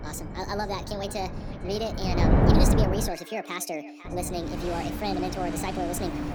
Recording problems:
wrong speed and pitch; too fast and too high; 1.5 times normal speed
echo of what is said; noticeable; throughout; 500 ms later, 15 dB below the speech
wind noise on the microphone; heavy; until 3 s and from 4 s on; 2 dB below the speech
alarms or sirens; loud; throughout; 8 dB below the speech
train or aircraft noise; loud; from 4.5 s on; 7 dB below the speech

